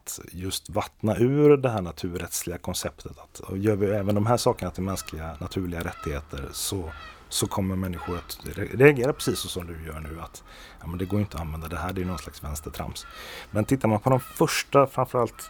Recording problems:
animal sounds; faint; from 3.5 s on; 20 dB below the speech

